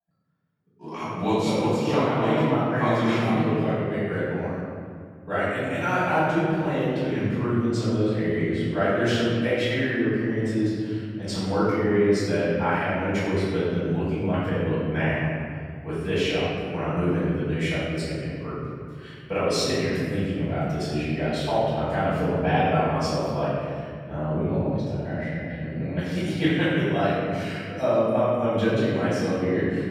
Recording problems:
room echo; strong; dies away in 2.2 s
off-mic speech; far

